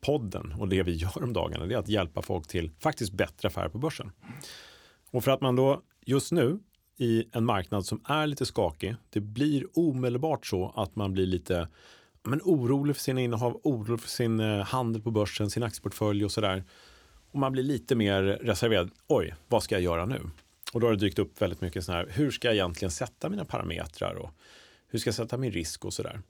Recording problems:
none

